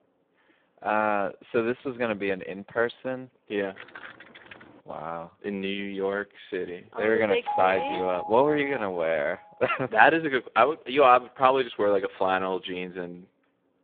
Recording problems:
phone-call audio; poor line
jangling keys; faint; from 4 to 5 s; peak 15 dB below the speech
doorbell; noticeable; from 7.5 to 9 s; peak 4 dB below the speech

